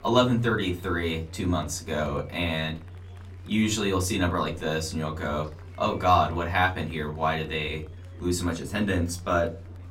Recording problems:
off-mic speech; far
room echo; very slight; dies away in 0.3 s
chatter from many people; faint; throughout; 25 dB below the speech

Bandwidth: 16.5 kHz